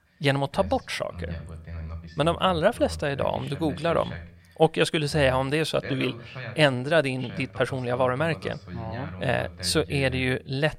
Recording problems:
voice in the background; noticeable; throughout; 15 dB below the speech

